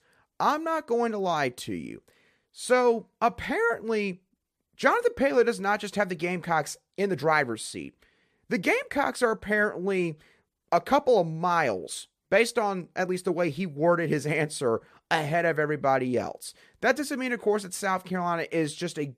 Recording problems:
none

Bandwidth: 14.5 kHz